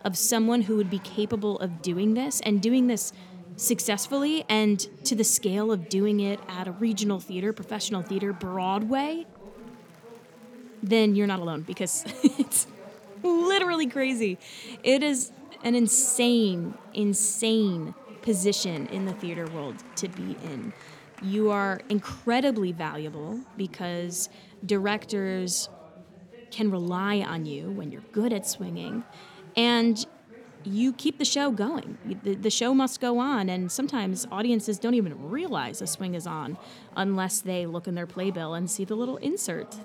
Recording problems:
chatter from many people; faint; throughout; 20 dB below the speech

